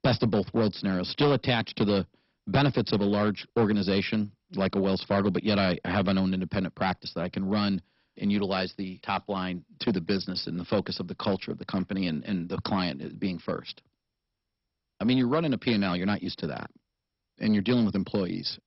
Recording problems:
garbled, watery; badly; nothing above 5.5 kHz
distortion; slight; 4% of the sound clipped

